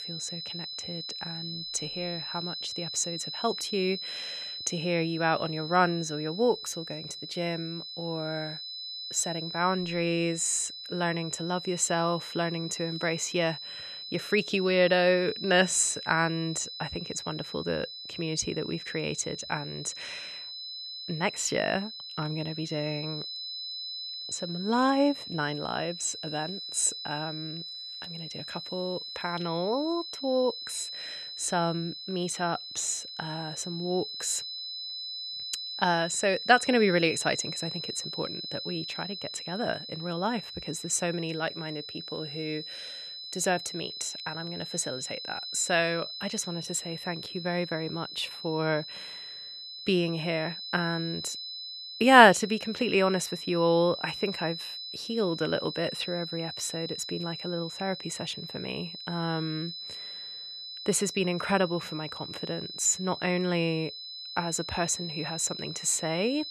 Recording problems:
high-pitched whine; loud; throughout; 4 kHz, 8 dB below the speech

